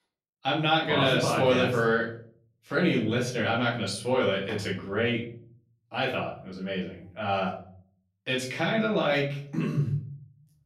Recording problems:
off-mic speech; far
room echo; slight; dies away in 0.6 s

